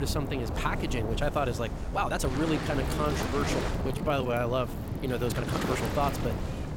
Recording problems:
wind noise on the microphone; heavy; 9 dB below the speech
rain or running water; loud; throughout; 7 dB below the speech
abrupt cut into speech; at the start
uneven, jittery; strongly; from 2 to 6 s

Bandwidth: 16.5 kHz